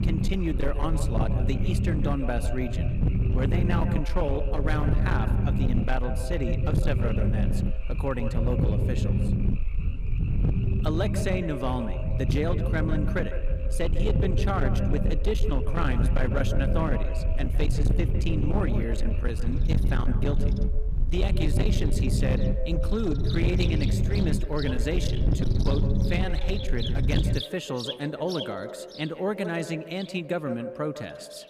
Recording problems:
echo of what is said; strong; throughout; 150 ms later, 9 dB below the speech
distortion; slight; 15% of the sound clipped
low rumble; loud; until 27 s; 6 dB below the speech
animal sounds; noticeable; throughout; 15 dB below the speech

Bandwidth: 15 kHz